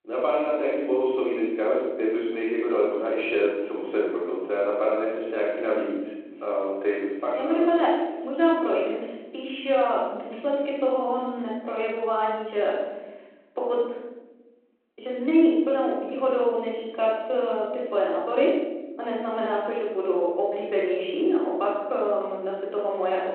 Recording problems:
room echo; strong; dies away in 1.4 s
off-mic speech; far
phone-call audio

